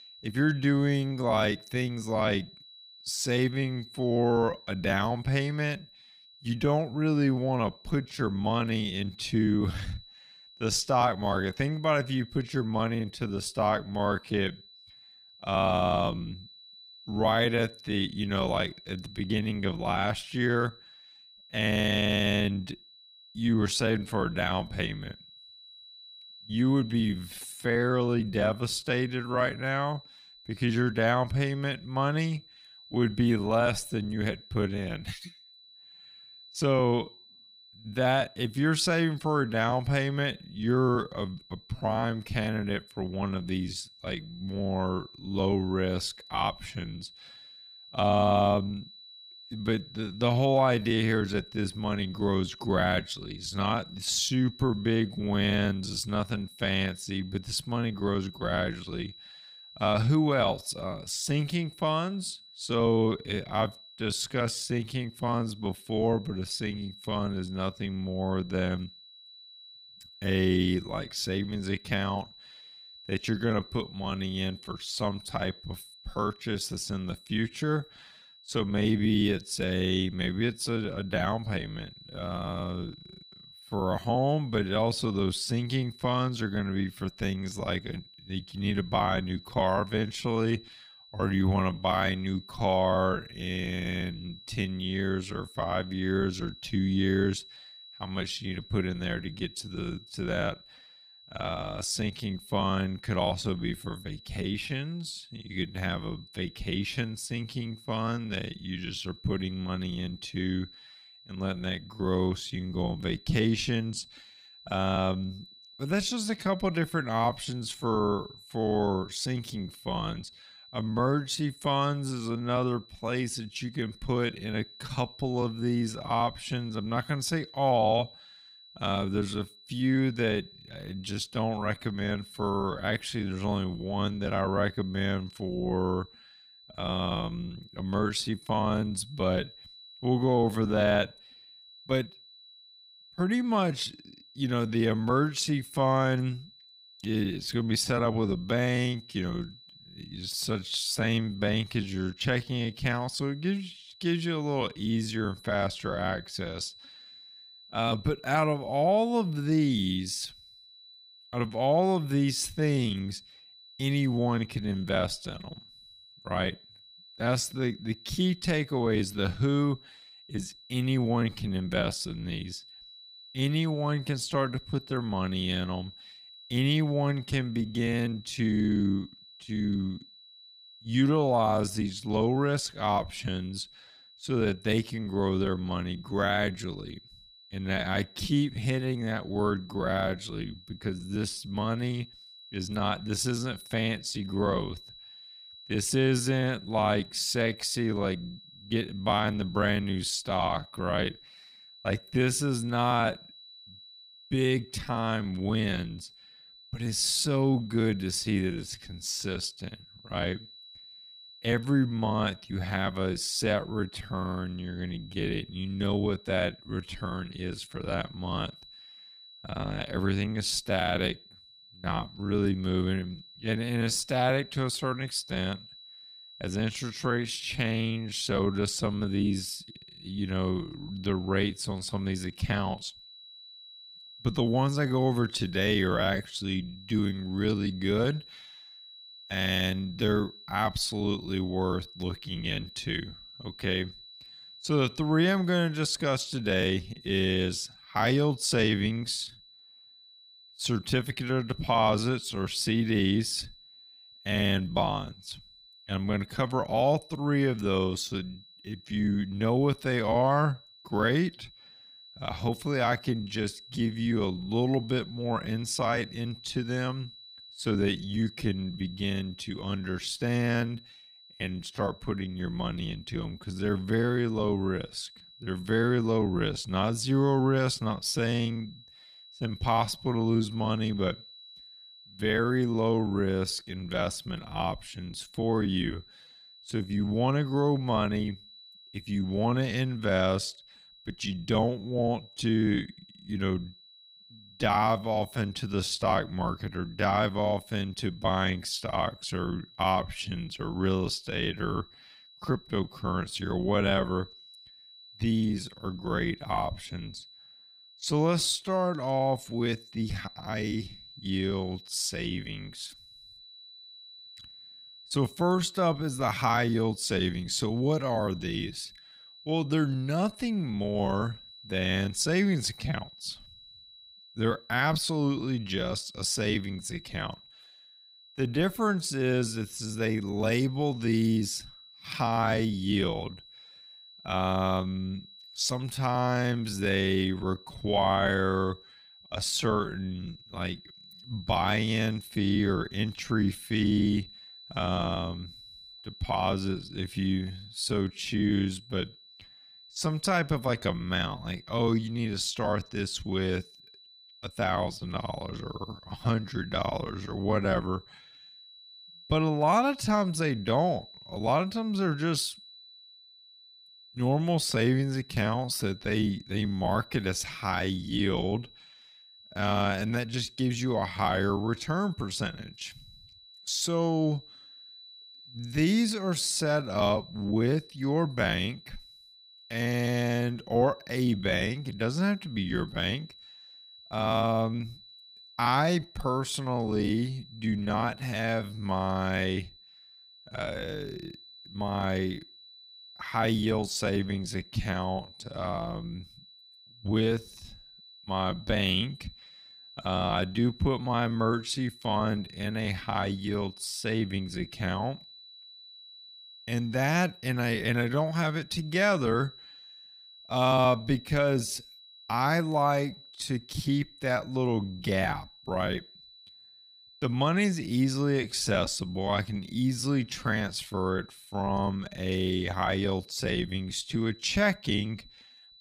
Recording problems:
wrong speed, natural pitch; too slow; 0.6 times normal speed
high-pitched whine; faint; throughout; 4 kHz, 20 dB below the speech

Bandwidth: 15.5 kHz